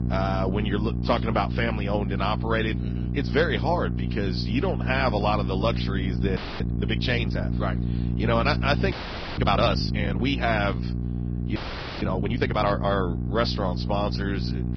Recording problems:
garbled, watery; badly
high frequencies cut off; noticeable; nothing above 5.5 kHz
electrical hum; noticeable; throughout; 60 Hz, 10 dB below the speech
audio freezing; at 6.5 s, at 9 s and at 12 s

